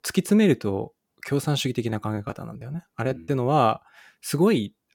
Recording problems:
choppy; very; from 2 to 3 s; 11% of the speech affected

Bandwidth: 18 kHz